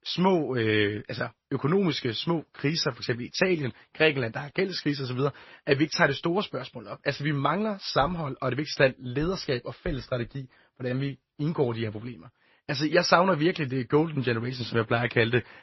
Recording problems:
garbled, watery; slightly; nothing above 5.5 kHz

